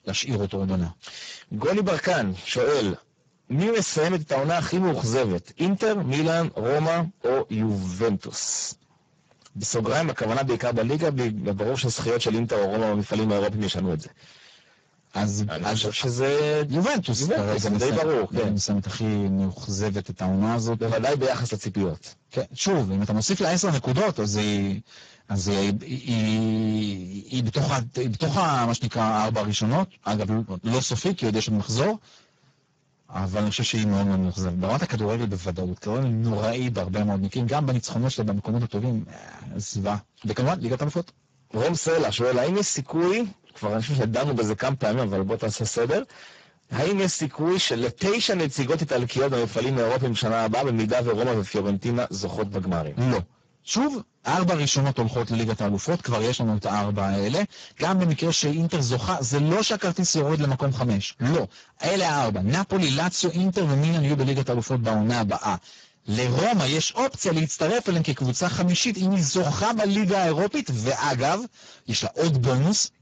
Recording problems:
distortion; heavy; 6 dB below the speech
garbled, watery; badly; nothing above 7.5 kHz

